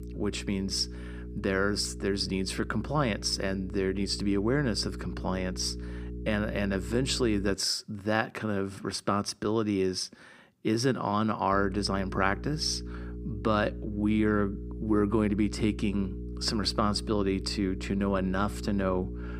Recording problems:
electrical hum; noticeable; until 7.5 s and from 12 s on; 60 Hz, 15 dB below the speech

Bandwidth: 15.5 kHz